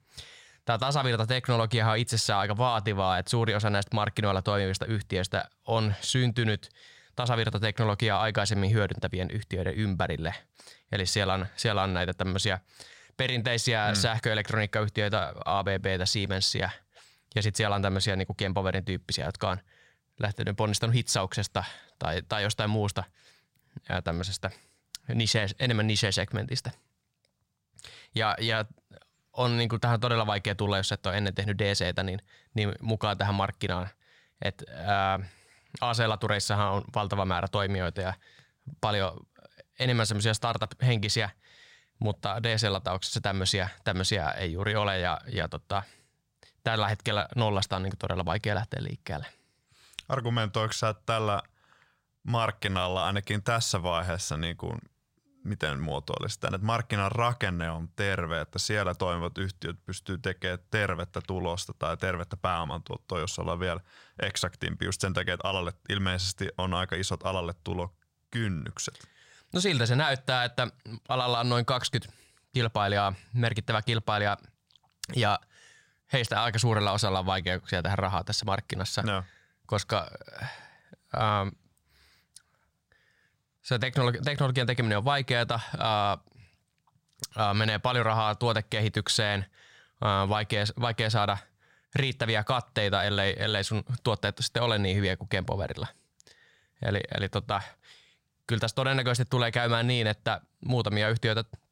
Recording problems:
none

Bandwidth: 16 kHz